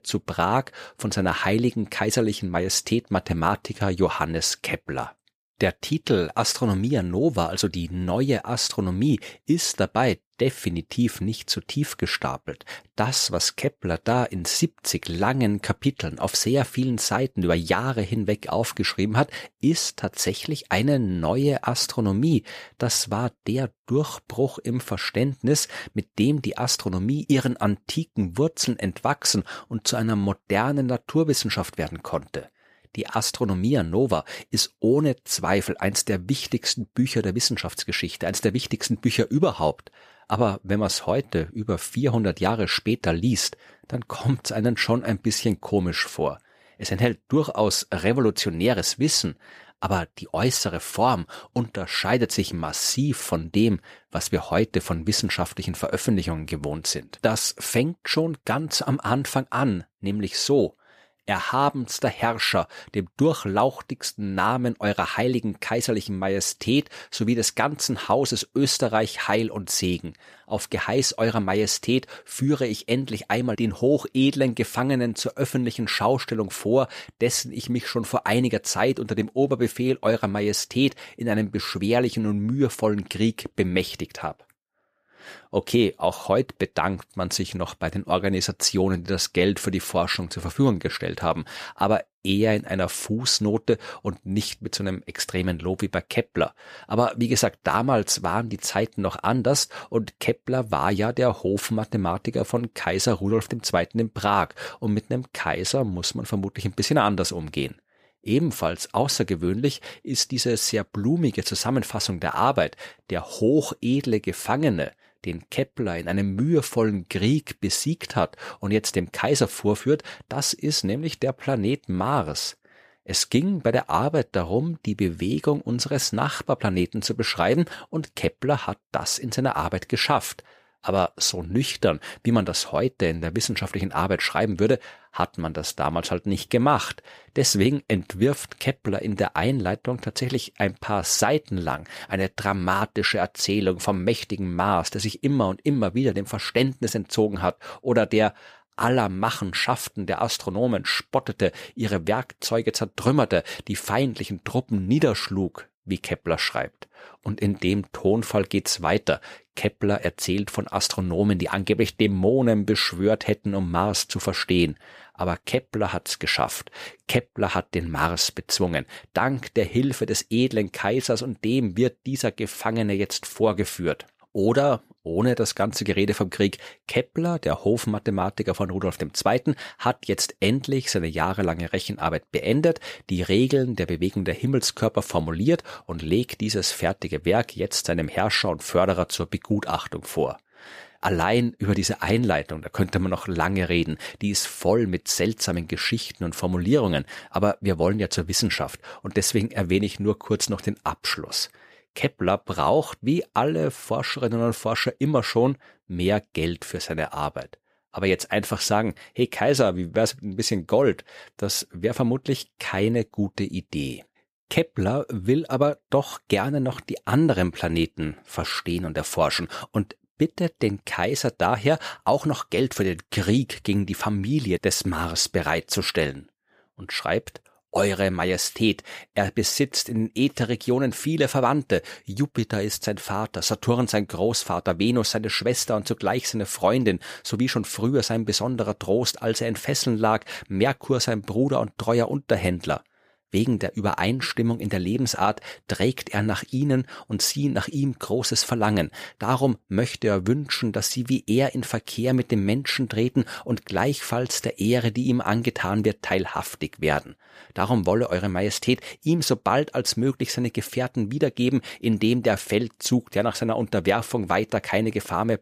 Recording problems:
none

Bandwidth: 14.5 kHz